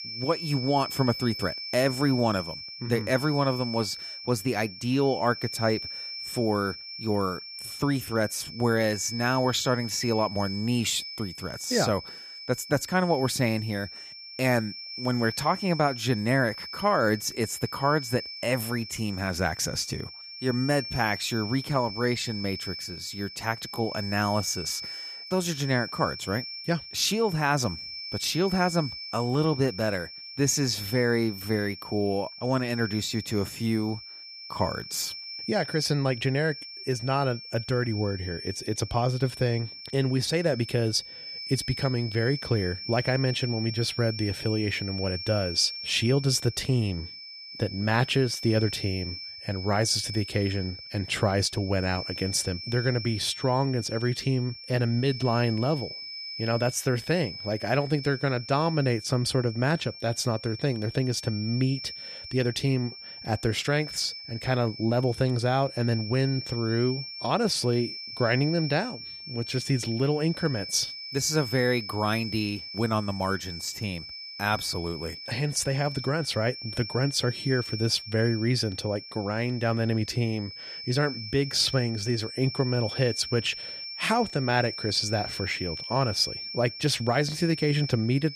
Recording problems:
high-pitched whine; loud; throughout; 5.5 kHz, 9 dB below the speech

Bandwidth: 14.5 kHz